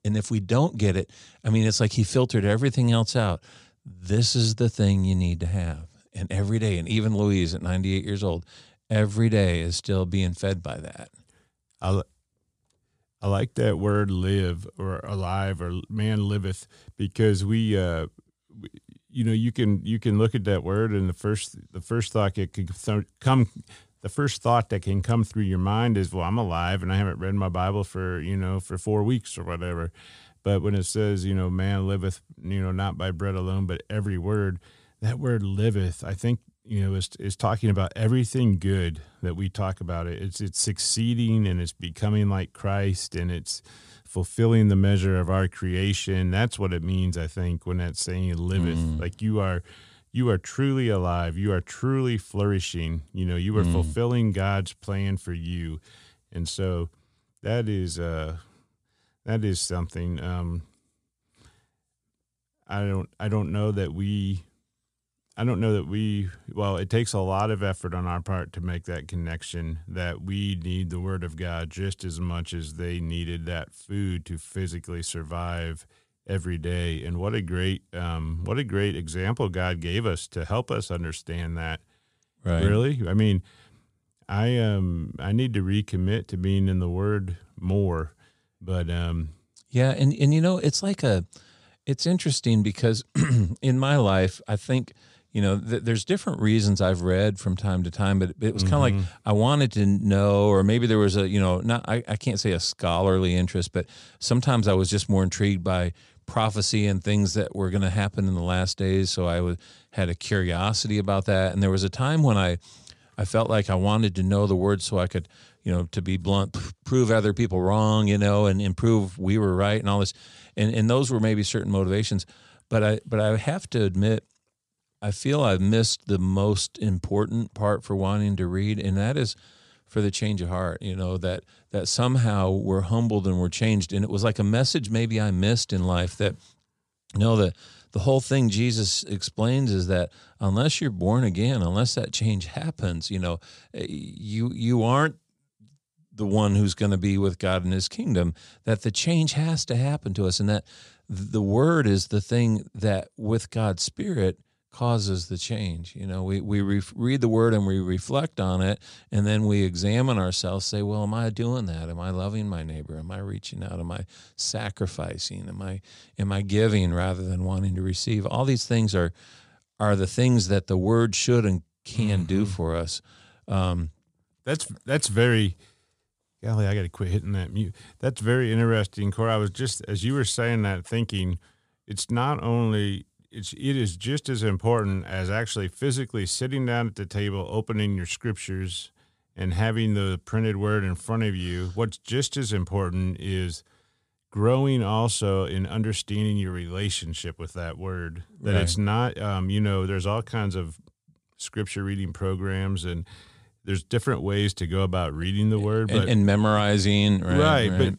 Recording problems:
none

